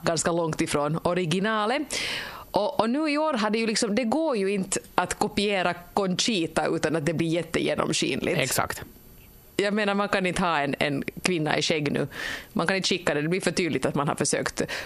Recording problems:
squashed, flat; heavily

